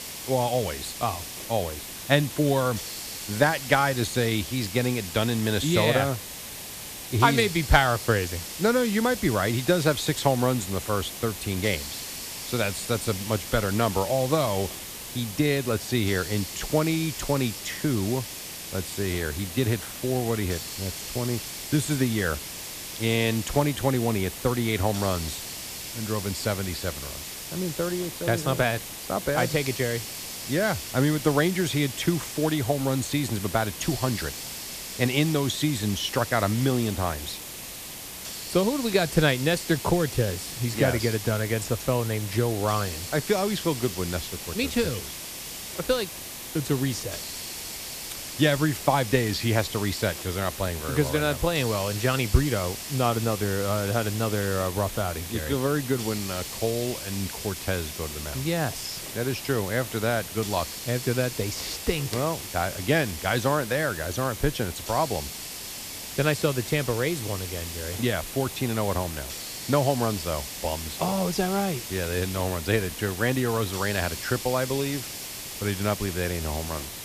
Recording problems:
hiss; loud; throughout; 8 dB below the speech

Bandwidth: 14.5 kHz